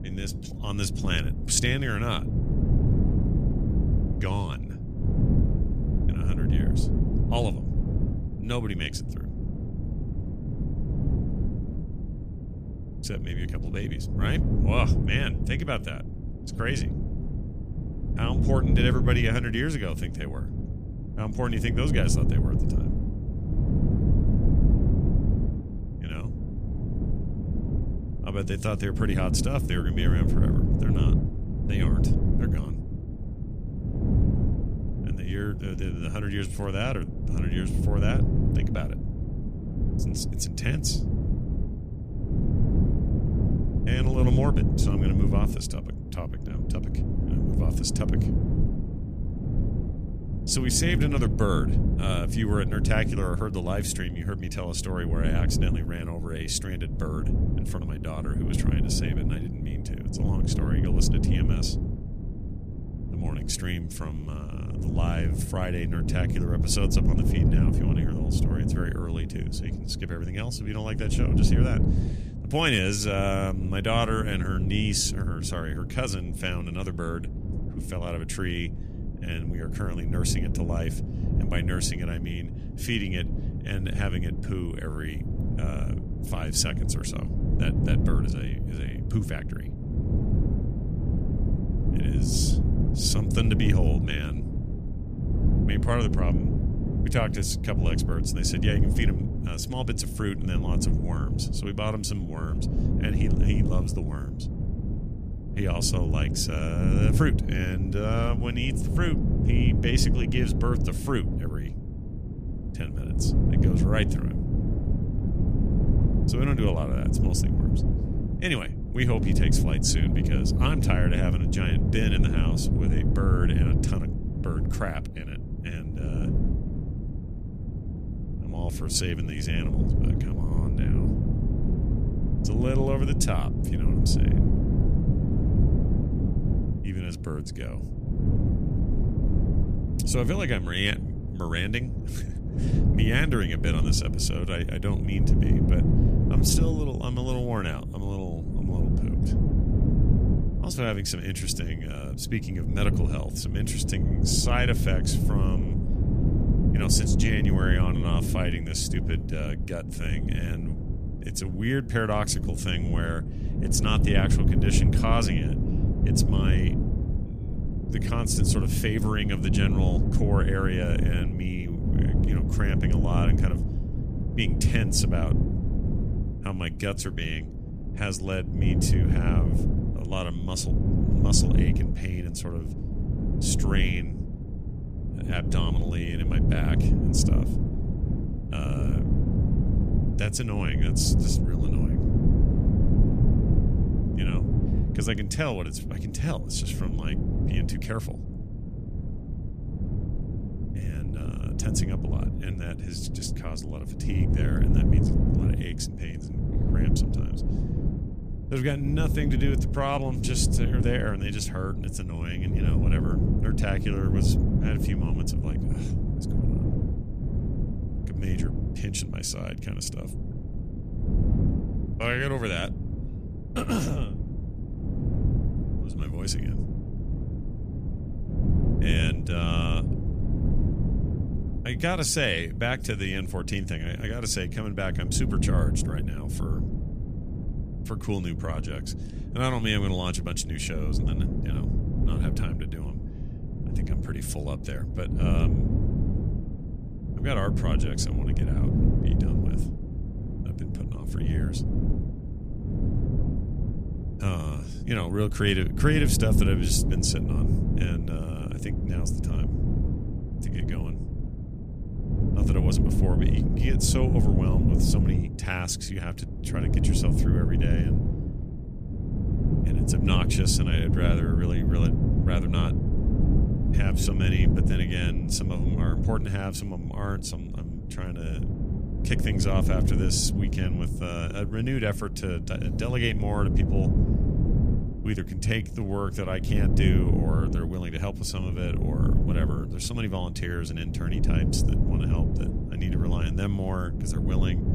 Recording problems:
wind noise on the microphone; heavy; 5 dB below the speech

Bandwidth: 14.5 kHz